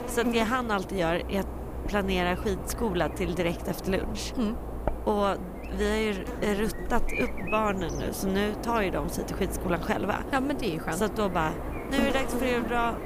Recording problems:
electrical hum; loud; throughout; 50 Hz, 8 dB below the speech

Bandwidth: 15 kHz